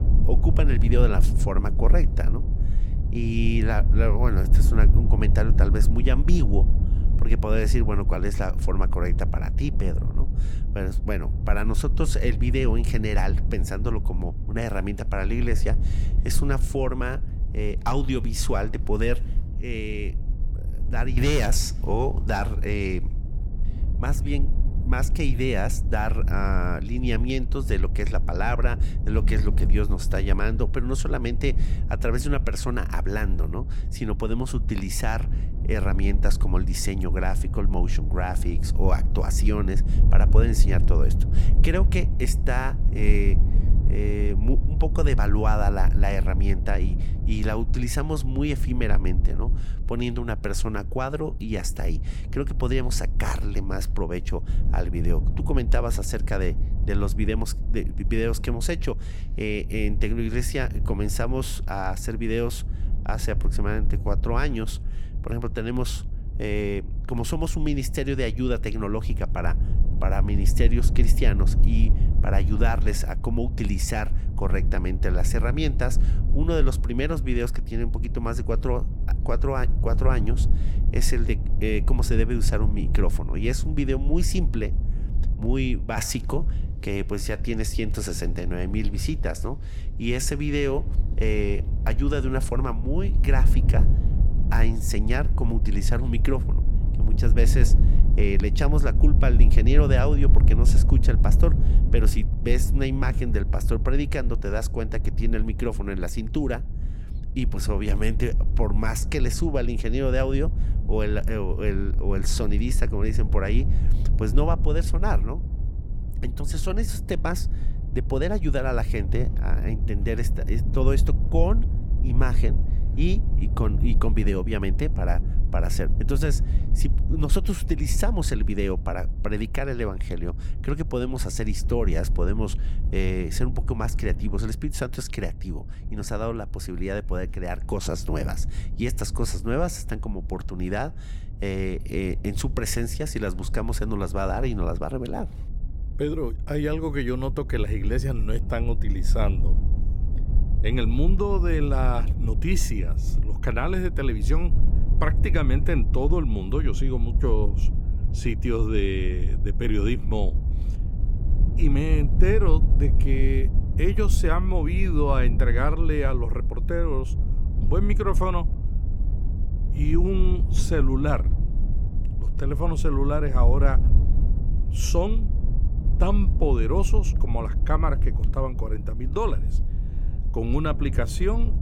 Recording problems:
low rumble; noticeable; throughout; 10 dB below the speech

